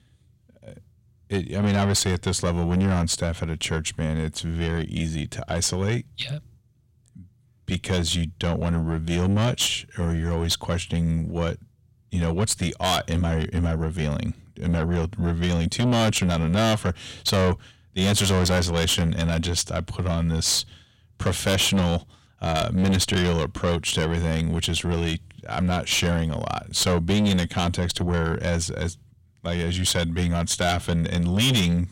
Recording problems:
distortion; heavy; 7 dB below the speech

